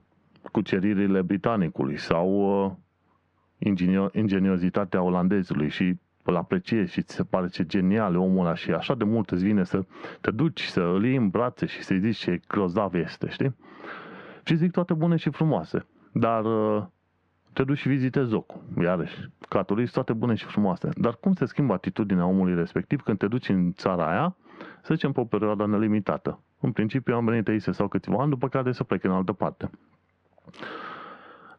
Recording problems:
squashed, flat; heavily
muffled; very slightly; fading above 2 kHz

